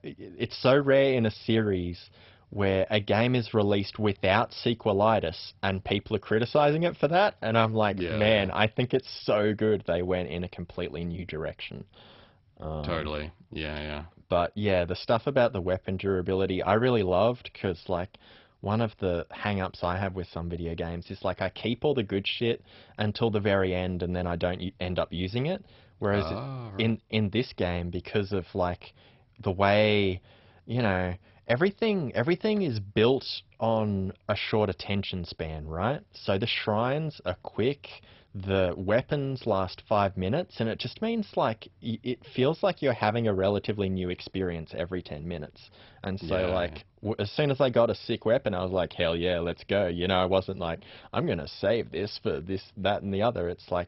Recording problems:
garbled, watery; badly; nothing above 5.5 kHz

